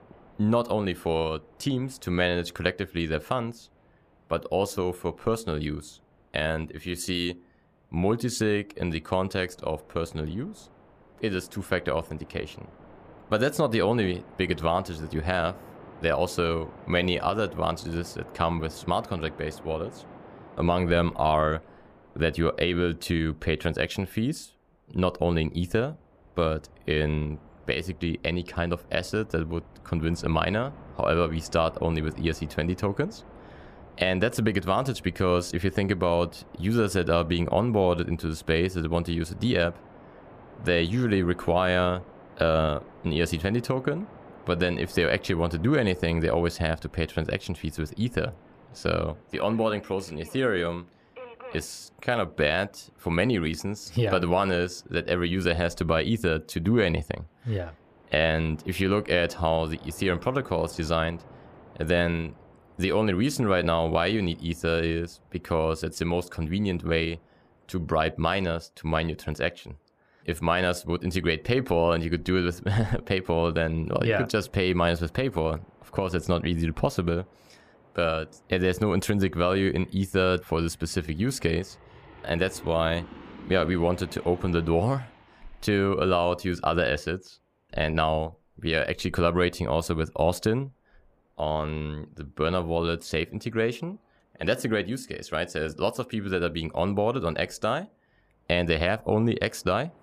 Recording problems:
train or aircraft noise; faint; throughout; 25 dB below the speech

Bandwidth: 14.5 kHz